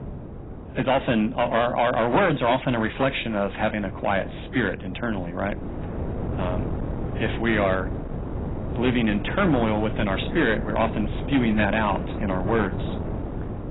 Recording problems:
garbled, watery; badly; nothing above 4 kHz
distortion; slight; 4% of the sound clipped
wind noise on the microphone; occasional gusts; 15 dB below the speech

